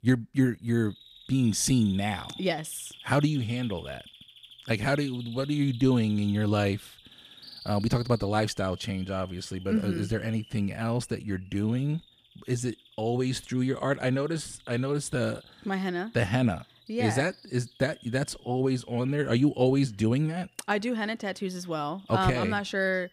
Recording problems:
animal sounds; noticeable; throughout; 20 dB below the speech

